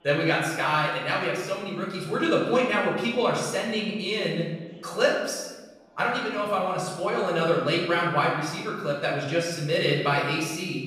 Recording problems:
off-mic speech; far
room echo; noticeable; dies away in 1 s
chatter from many people; faint; throughout; 25 dB below the speech

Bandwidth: 15 kHz